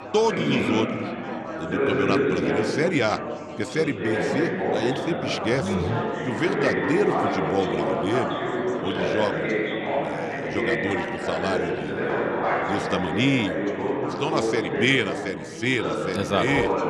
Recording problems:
chatter from many people; very loud; throughout; as loud as the speech

